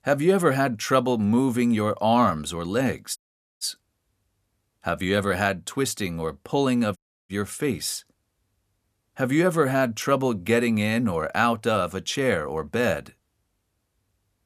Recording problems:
audio cutting out; at 3 s and at 7 s

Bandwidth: 14.5 kHz